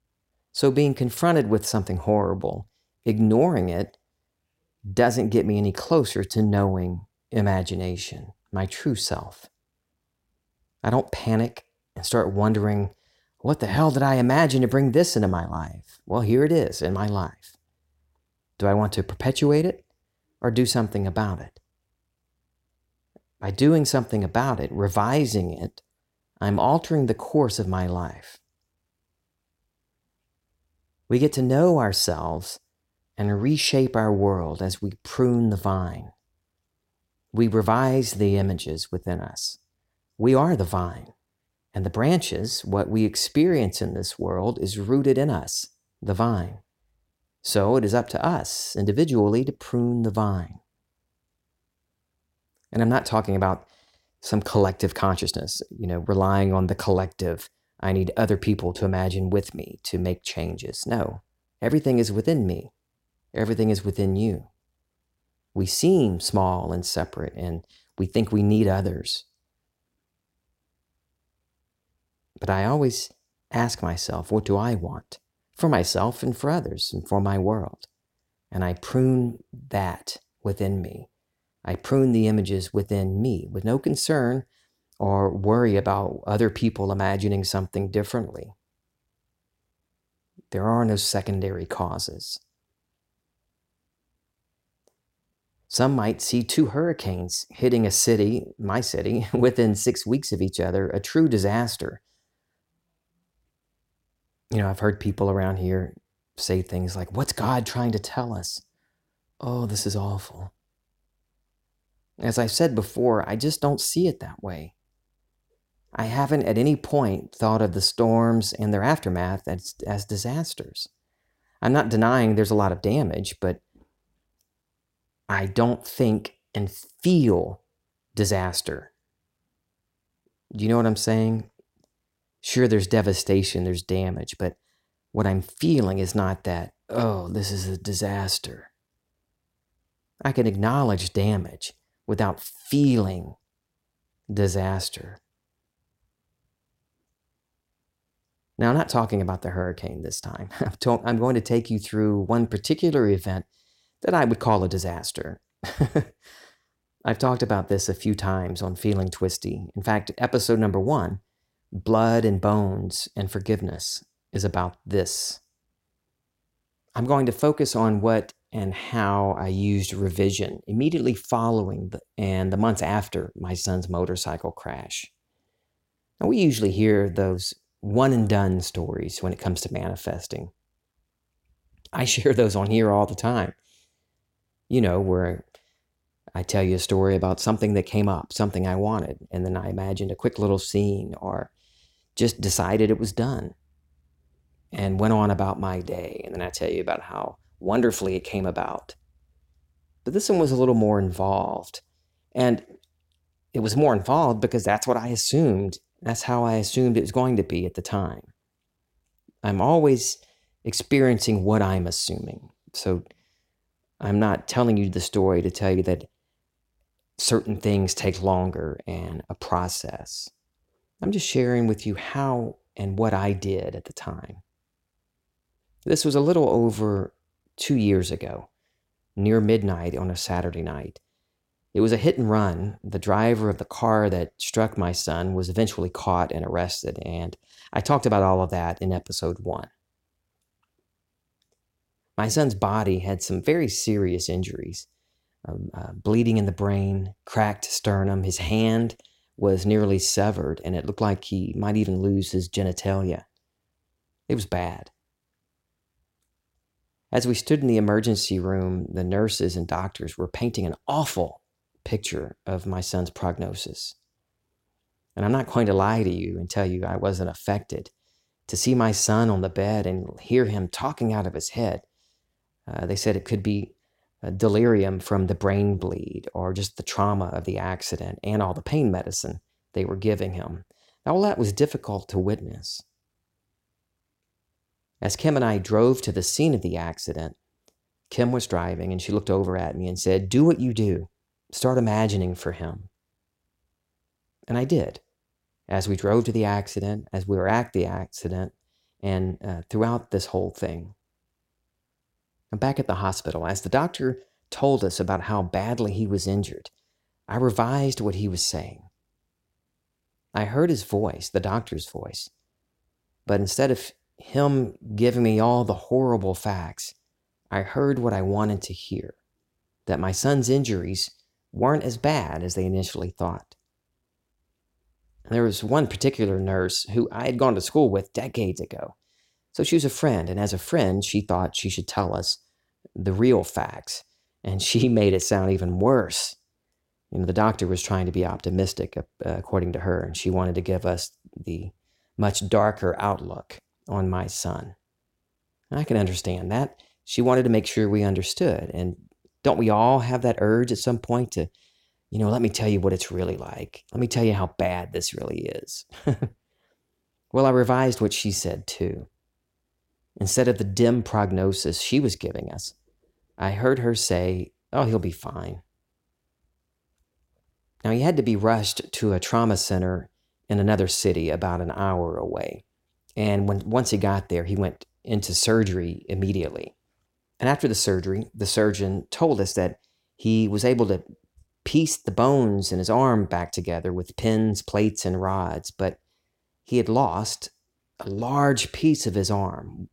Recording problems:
none

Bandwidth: 16.5 kHz